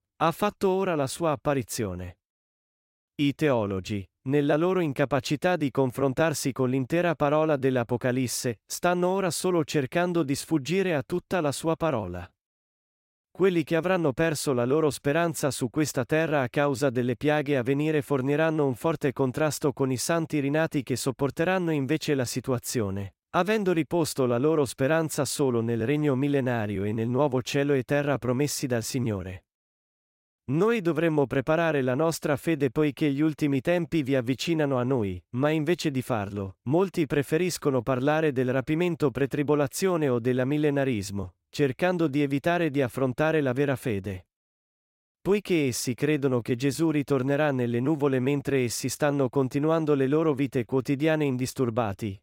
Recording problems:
none

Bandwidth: 16 kHz